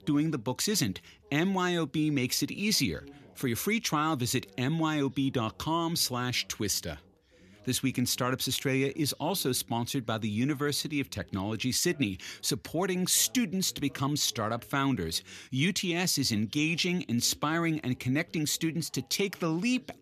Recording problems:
background chatter; faint; throughout; 2 voices, 30 dB below the speech

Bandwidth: 14 kHz